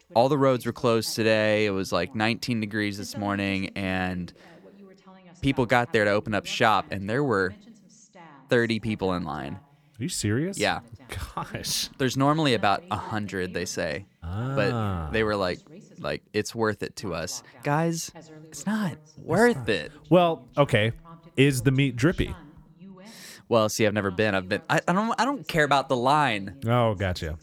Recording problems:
voice in the background; faint; throughout; 25 dB below the speech

